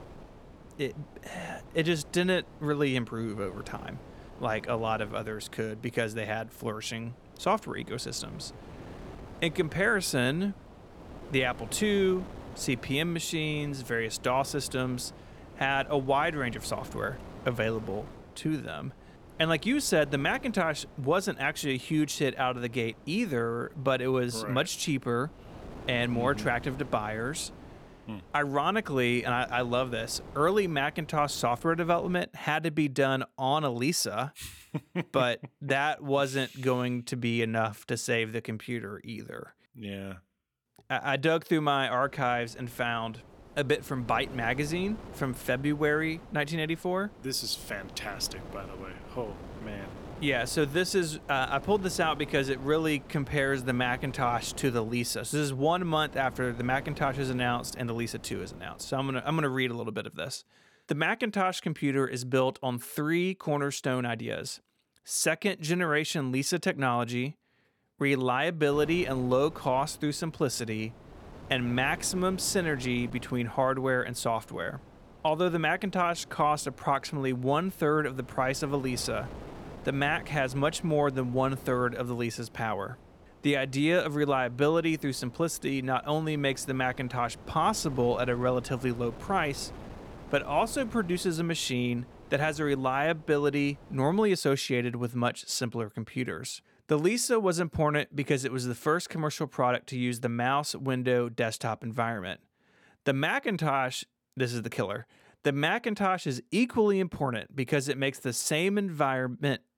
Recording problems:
wind noise on the microphone; occasional gusts; until 32 s, from 42 to 59 s and from 1:09 to 1:34; 20 dB below the speech

